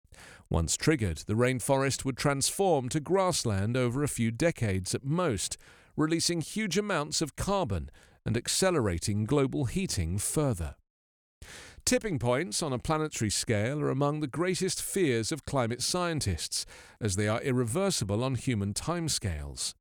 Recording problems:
none

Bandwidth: 18 kHz